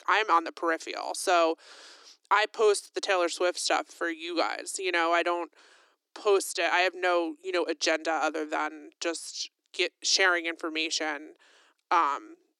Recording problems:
thin; very; fading below 300 Hz

